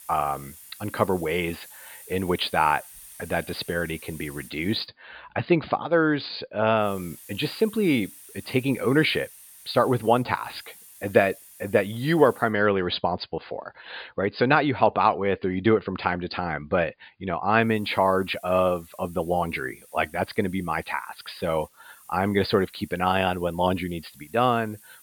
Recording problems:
high frequencies cut off; severe; nothing above 5 kHz
hiss; faint; until 5 s, from 7 to 12 s and from 18 s on; 20 dB below the speech

